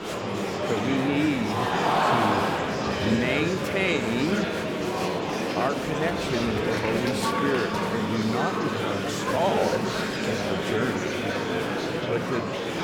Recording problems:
murmuring crowd; very loud; throughout; 2 dB above the speech

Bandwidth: 18.5 kHz